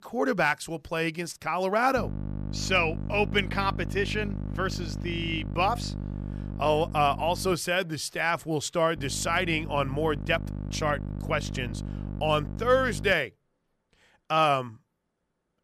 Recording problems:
electrical hum; noticeable; from 2 to 7.5 s and from 9 to 13 s; 50 Hz, 20 dB below the speech

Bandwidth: 14.5 kHz